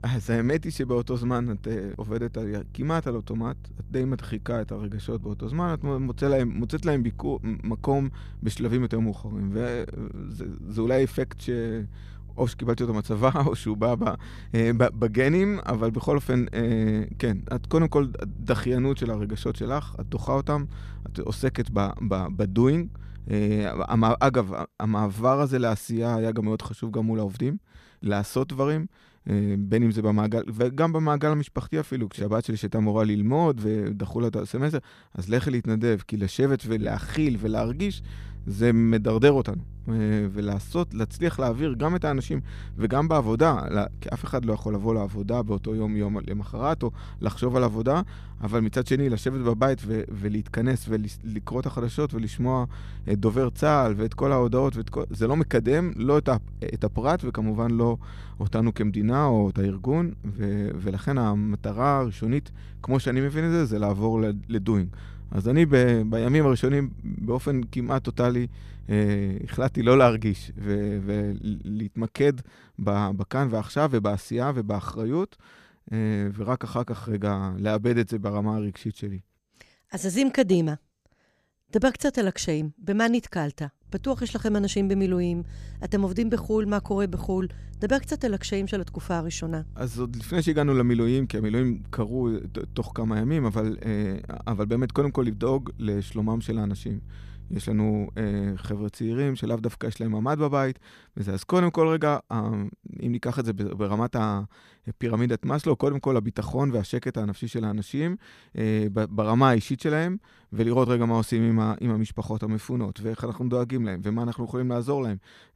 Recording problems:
electrical hum; faint; until 24 s, from 37 s to 1:12 and from 1:24 to 1:39; 50 Hz, 30 dB below the speech

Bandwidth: 14.5 kHz